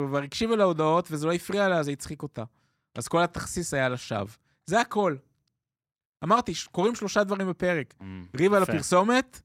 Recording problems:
abrupt cut into speech; at the start

